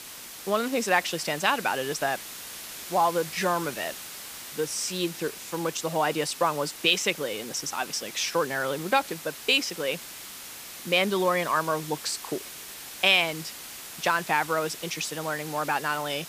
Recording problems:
hiss; noticeable; throughout; 10 dB below the speech

